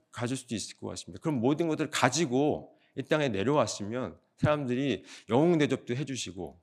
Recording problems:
none

